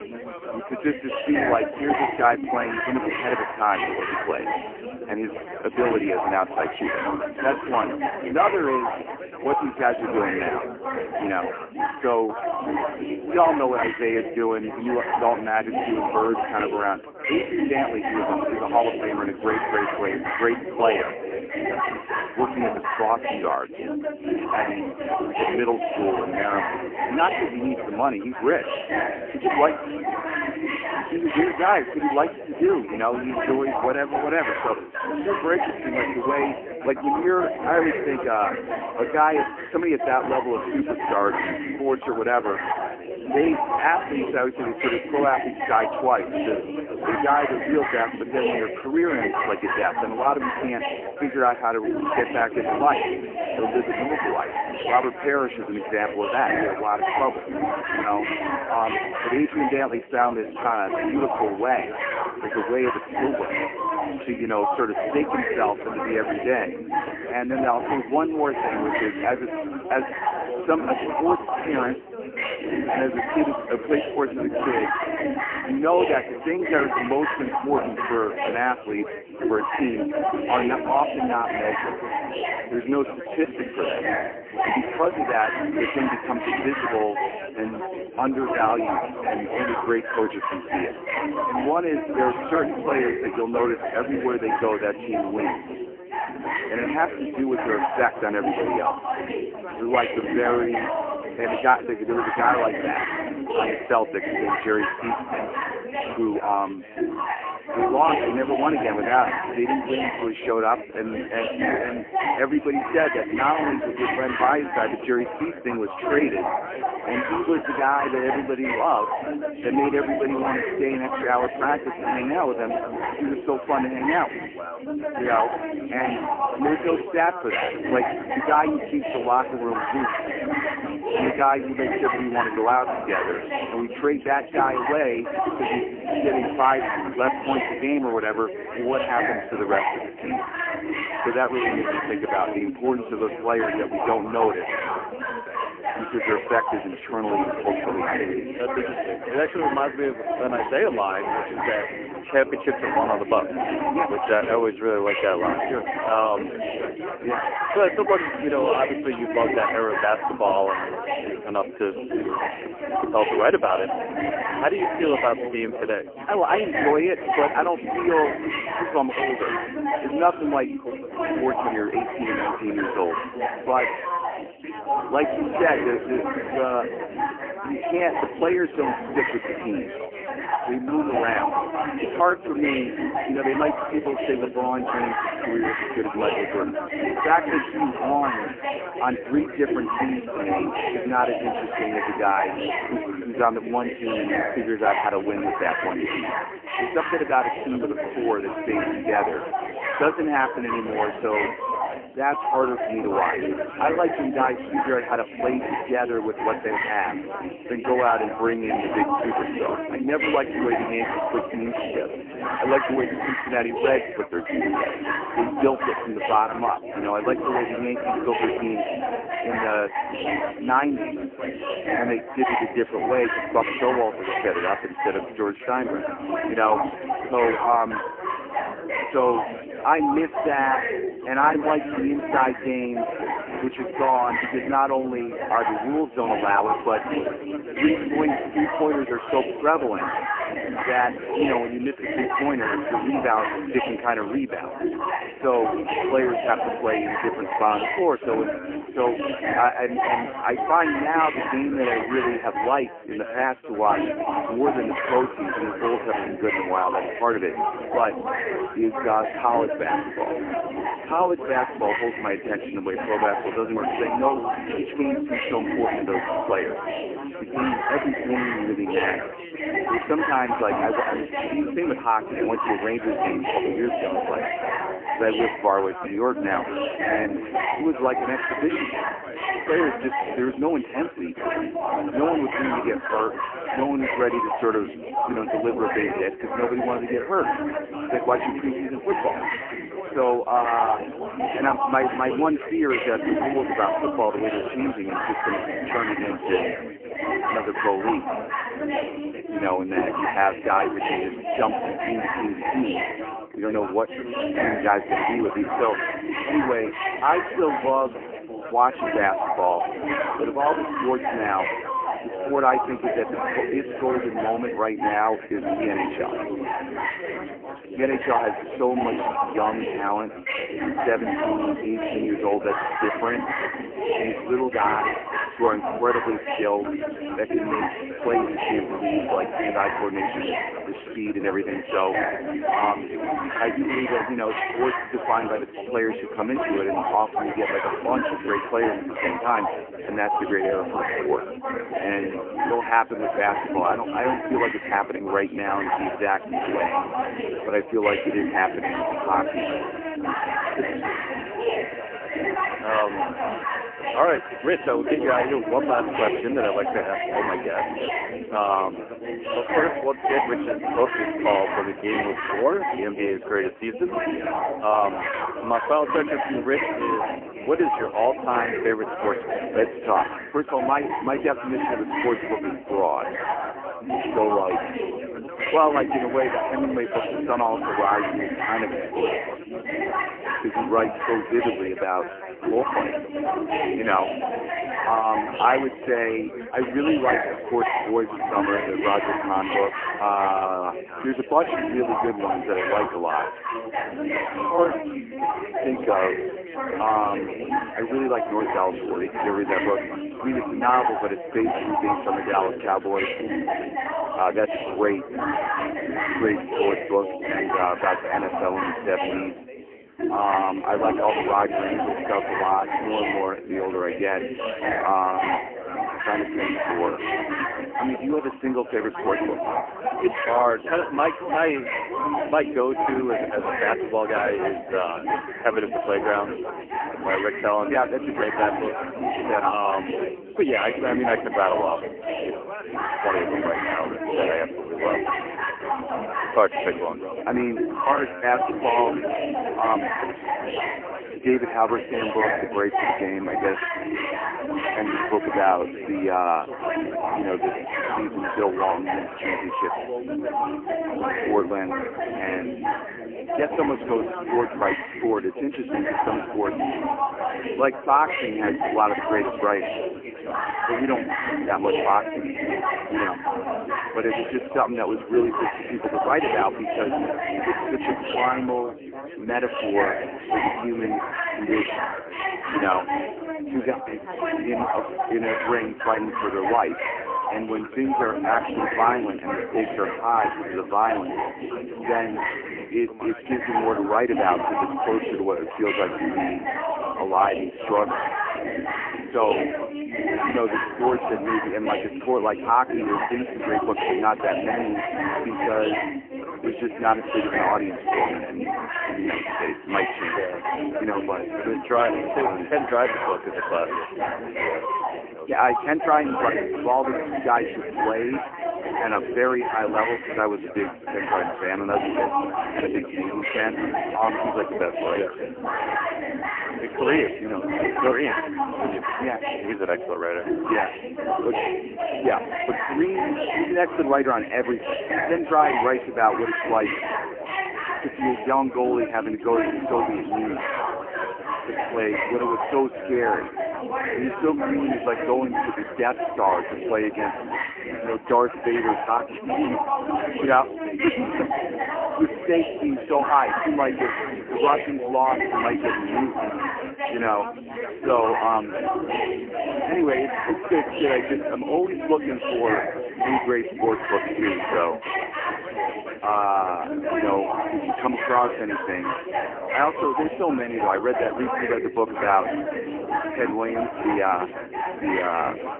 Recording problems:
phone-call audio; poor line
chatter from many people; loud; throughout; 3 dB below the speech
alarm; faint; from 5:49 to 5:55; peak 10 dB below the speech

